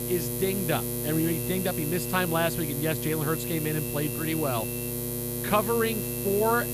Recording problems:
electrical hum; loud; throughout; 60 Hz, 6 dB below the speech
high-pitched whine; noticeable; from 1 to 2.5 s, from 3.5 to 5 s and from 5.5 s on; 2.5 kHz, 20 dB below the speech

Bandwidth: 15 kHz